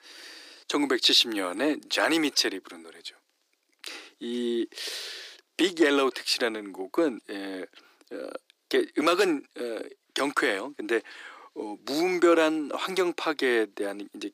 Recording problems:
thin; very; fading below 300 Hz

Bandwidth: 15 kHz